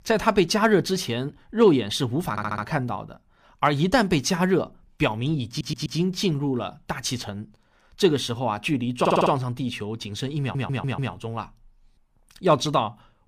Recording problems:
audio stuttering; 4 times, first at 2.5 s

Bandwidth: 15 kHz